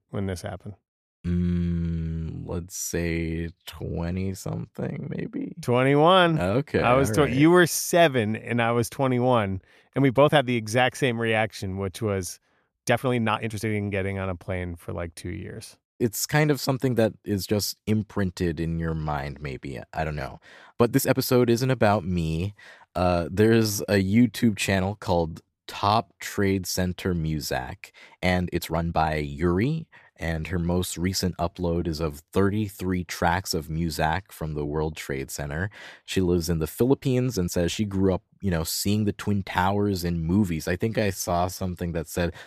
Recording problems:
uneven, jittery; strongly; from 3.5 to 42 s

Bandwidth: 14.5 kHz